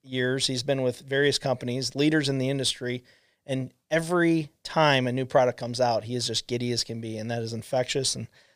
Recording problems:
none

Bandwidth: 15 kHz